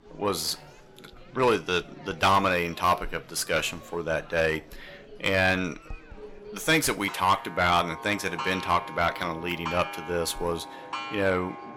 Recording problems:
distortion; heavy; 7 dB below the speech
household noises; noticeable; throughout; 10 dB below the speech
chatter from many people; faint; throughout; 20 dB below the speech

